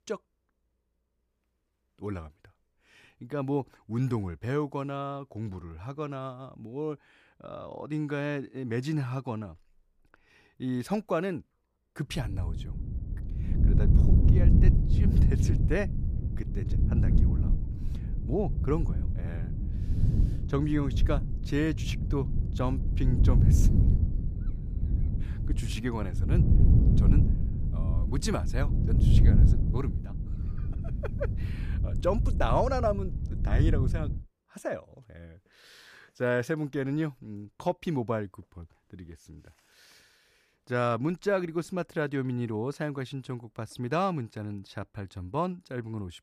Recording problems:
wind noise on the microphone; heavy; from 12 to 34 s; 7 dB below the speech

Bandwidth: 14.5 kHz